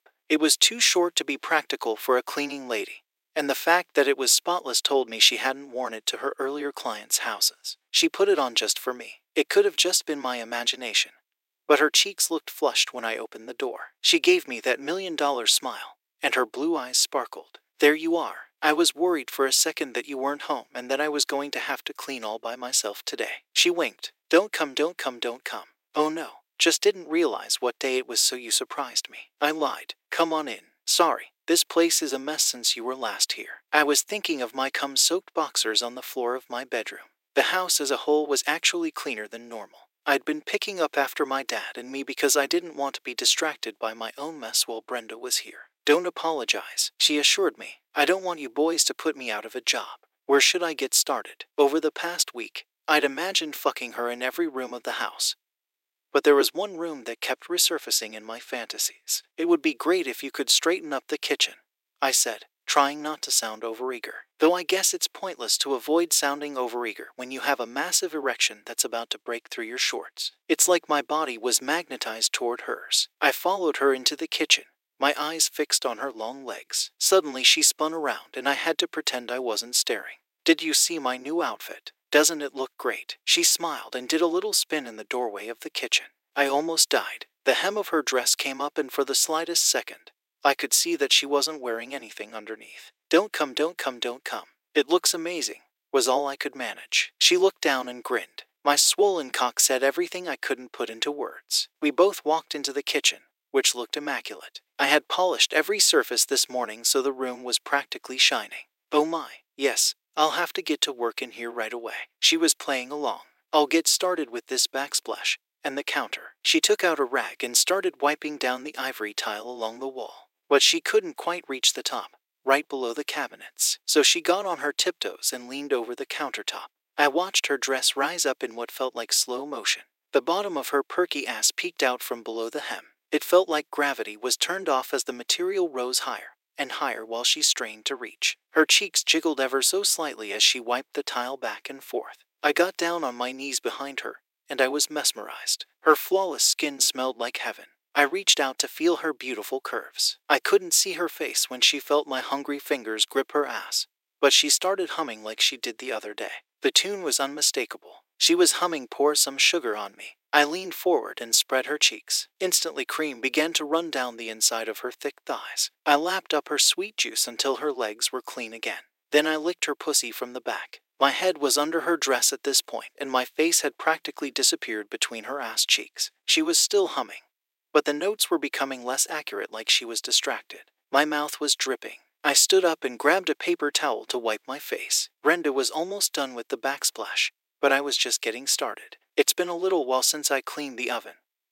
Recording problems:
thin; very; fading below 350 Hz

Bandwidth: 16 kHz